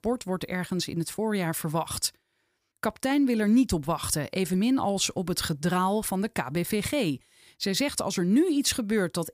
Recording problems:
none

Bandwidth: 15 kHz